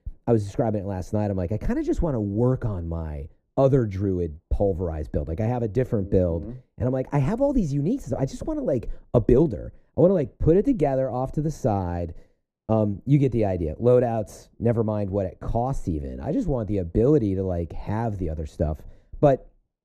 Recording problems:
muffled; very; fading above 1 kHz

